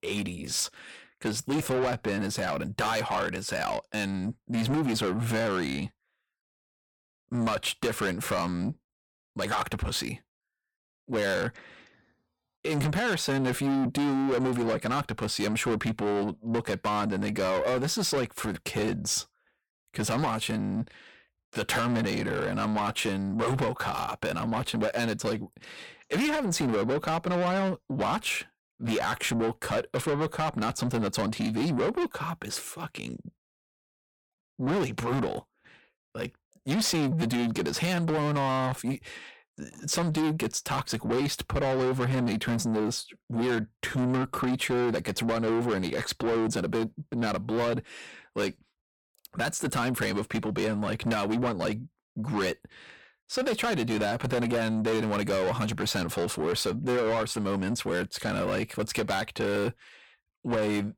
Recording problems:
distortion; heavy; 7 dB below the speech

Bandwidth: 17.5 kHz